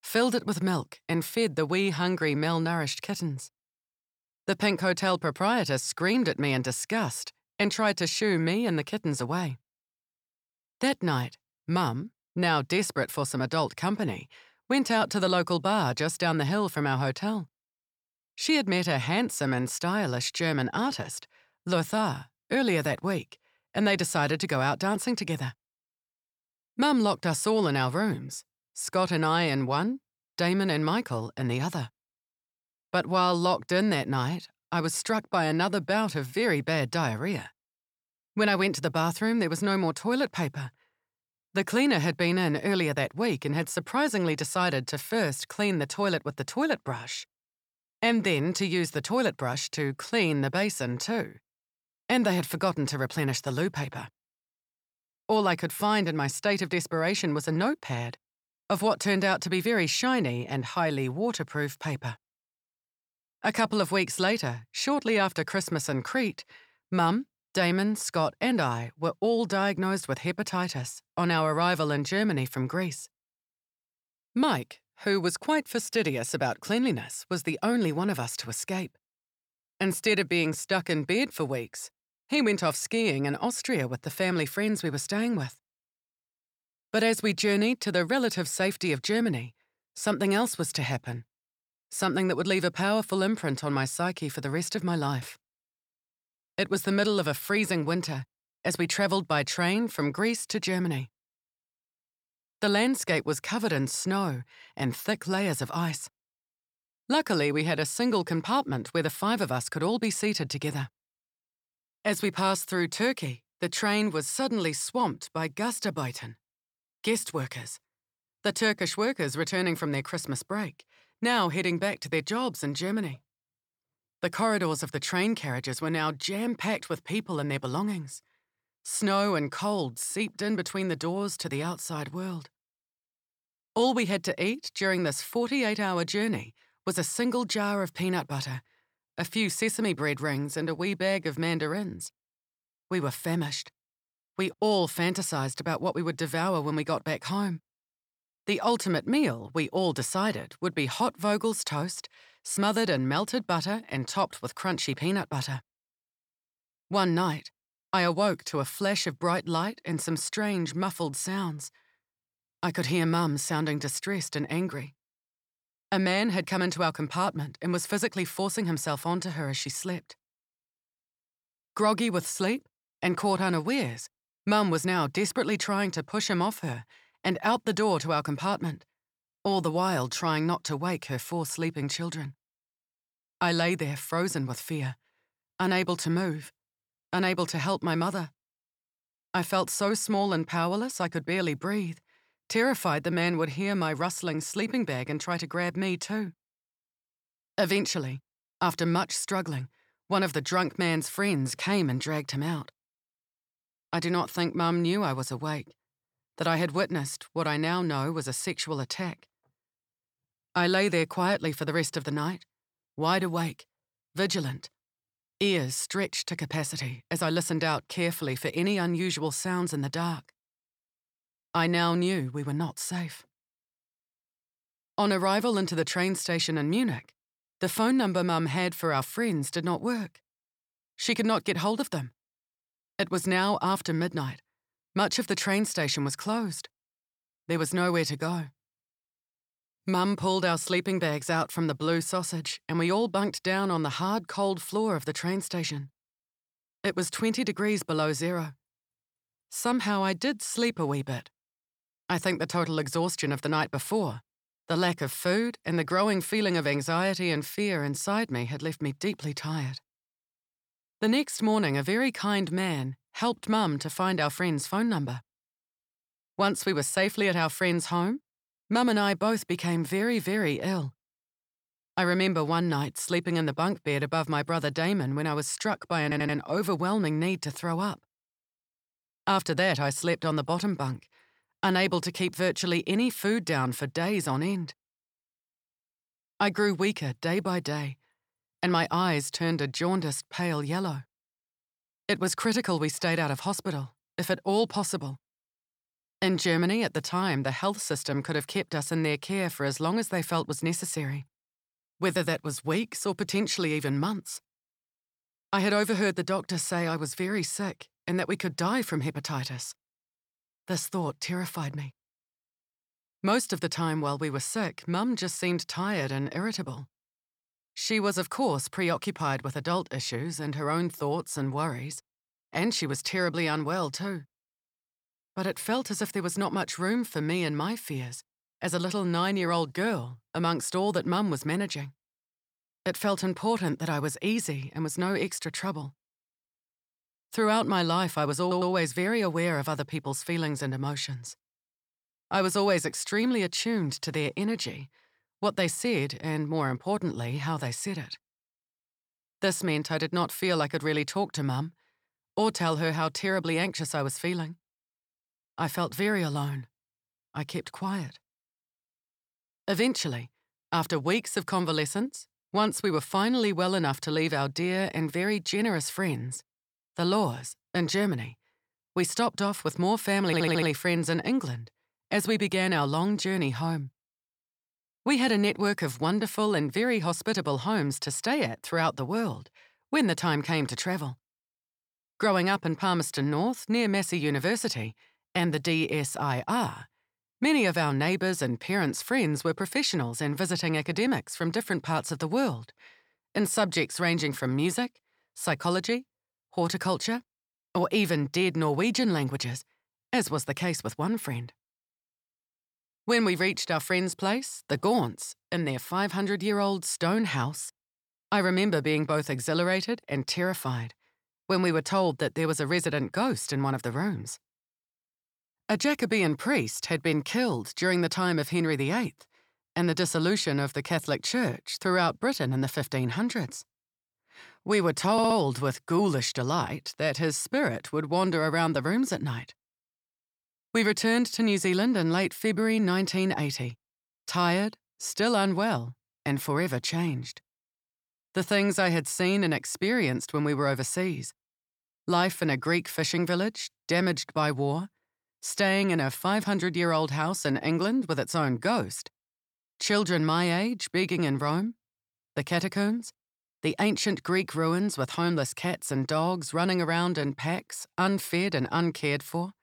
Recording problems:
audio stuttering; 4 times, first at 4:36

